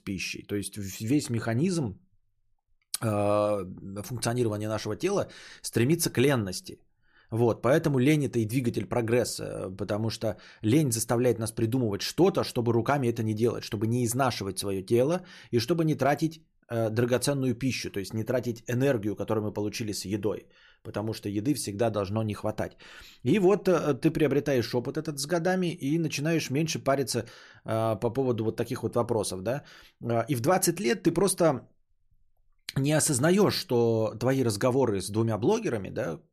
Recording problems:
none

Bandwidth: 14 kHz